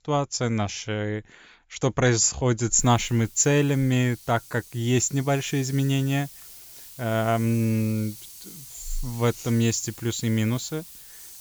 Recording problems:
high frequencies cut off; noticeable; nothing above 7.5 kHz
hiss; noticeable; from 3 s on; 15 dB below the speech

